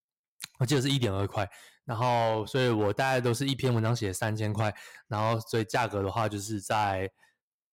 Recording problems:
distortion; slight; 5% of the sound clipped

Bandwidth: 16 kHz